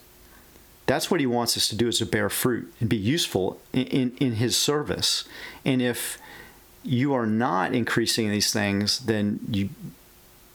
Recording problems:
squashed, flat; heavily

